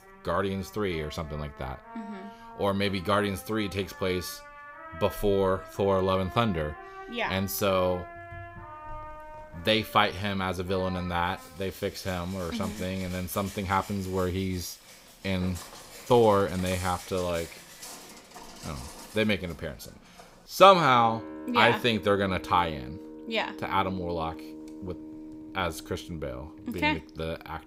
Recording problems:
background music; noticeable; throughout; 15 dB below the speech
footsteps; faint; from 15 to 20 s; peak 10 dB below the speech

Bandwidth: 15.5 kHz